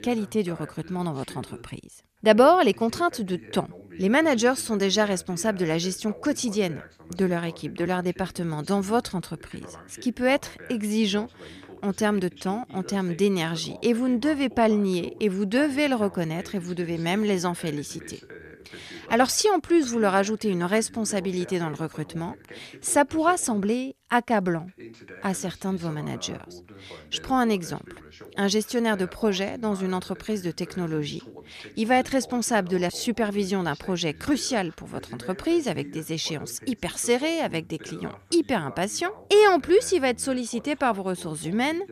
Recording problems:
voice in the background; faint; throughout; 20 dB below the speech

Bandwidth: 14.5 kHz